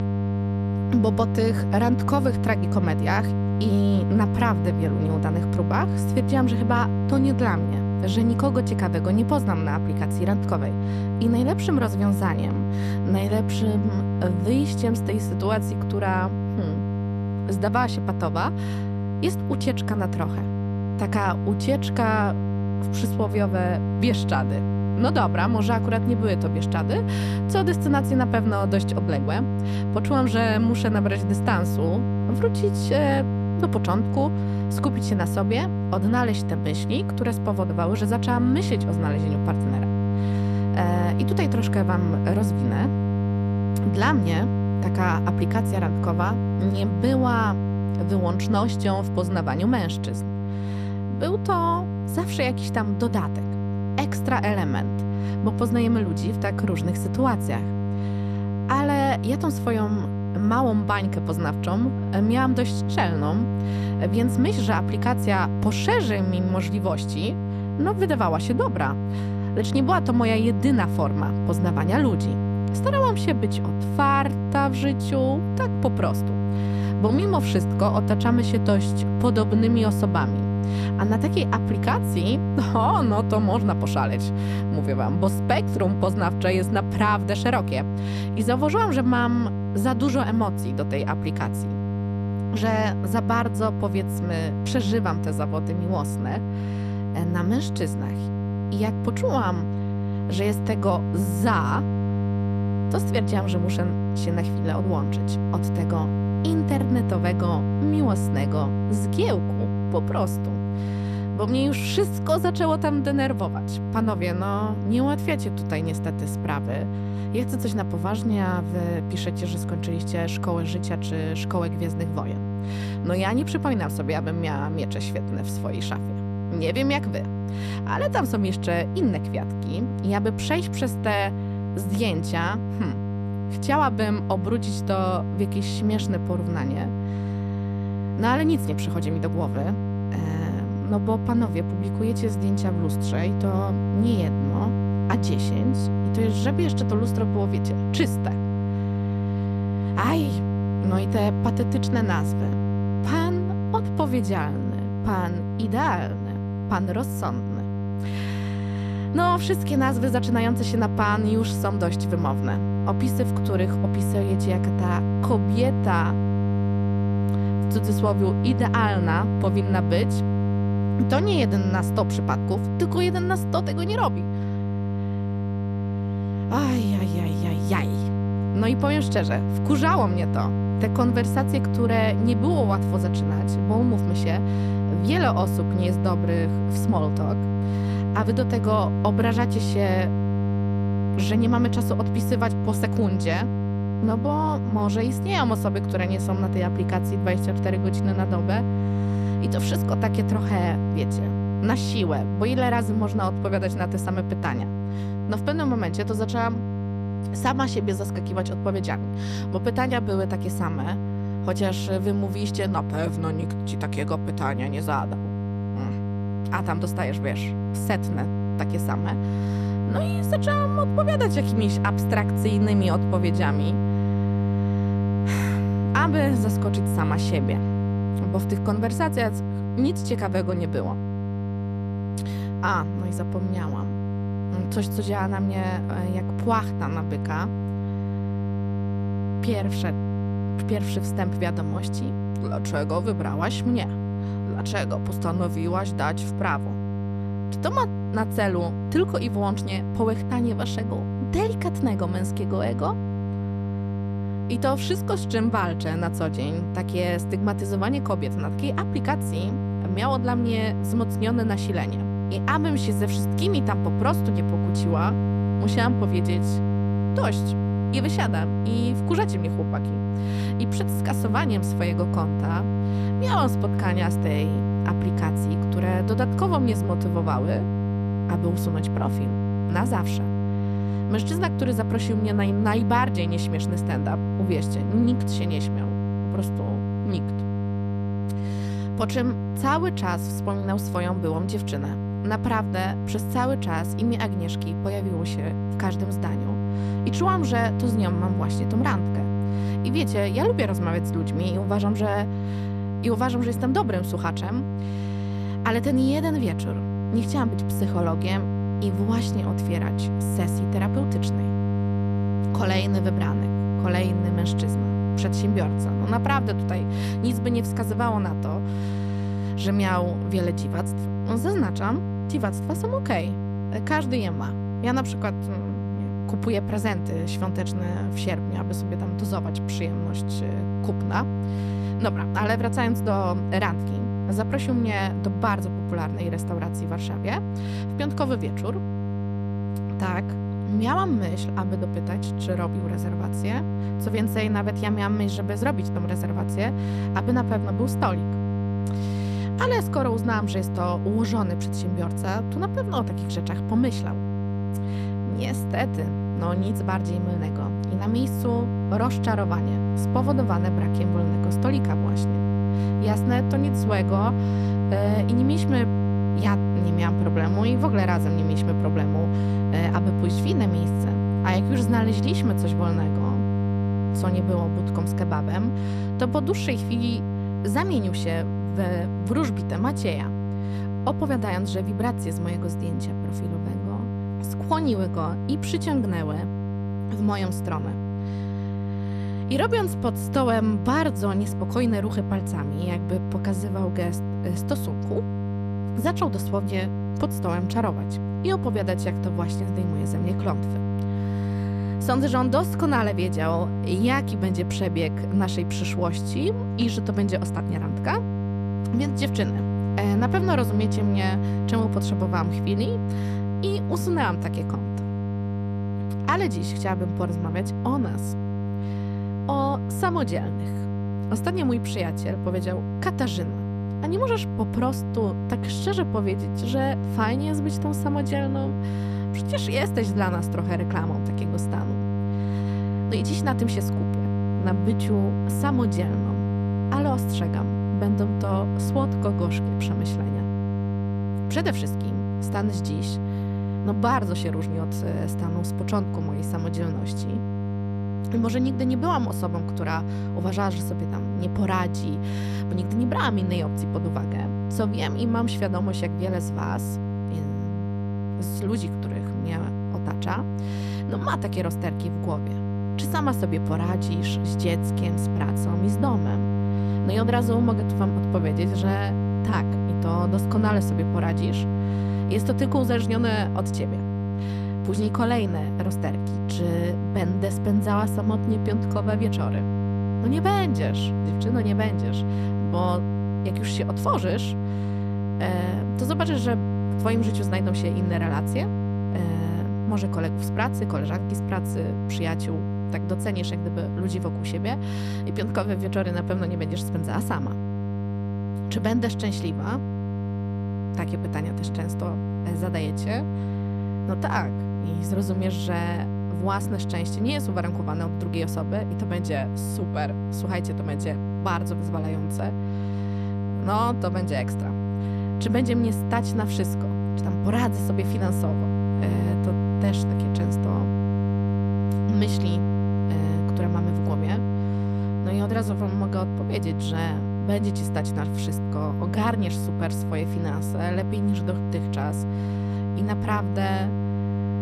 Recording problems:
electrical hum; loud; throughout; 50 Hz, 6 dB below the speech

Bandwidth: 14 kHz